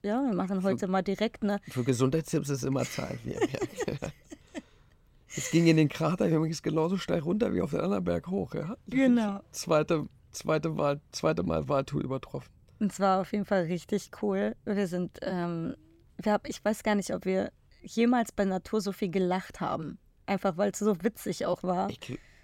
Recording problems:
none

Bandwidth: 16.5 kHz